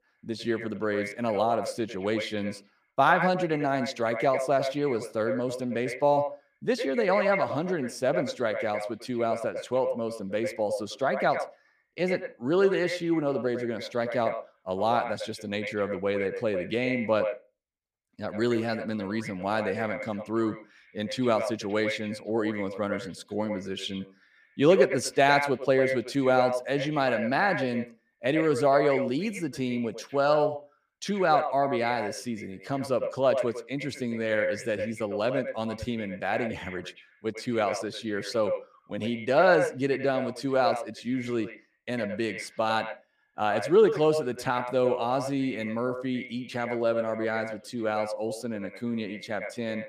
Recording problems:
echo of what is said; strong; throughout; 100 ms later, 7 dB below the speech

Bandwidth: 15 kHz